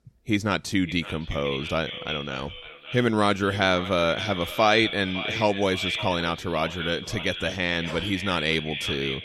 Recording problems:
echo of what is said; strong; throughout; 560 ms later, 7 dB below the speech

